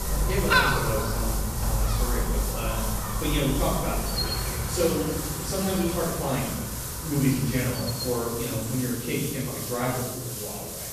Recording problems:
off-mic speech; far
room echo; noticeable; dies away in 1.2 s
animal sounds; loud; throughout; 1 dB below the speech
hiss; loud; throughout; 4 dB below the speech

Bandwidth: 14.5 kHz